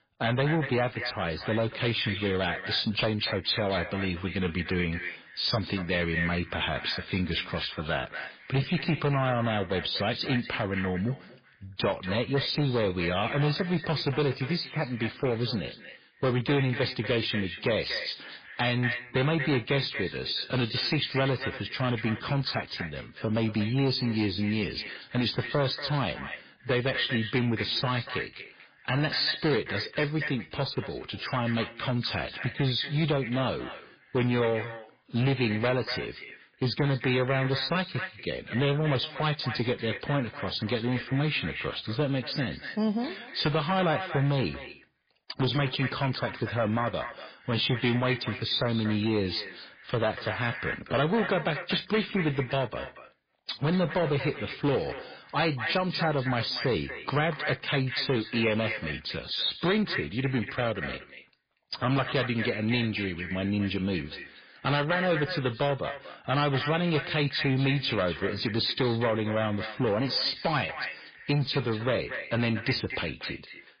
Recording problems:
echo of what is said; strong; throughout; 240 ms later, 10 dB below the speech
garbled, watery; badly
distortion; slight; 6% of the sound clipped

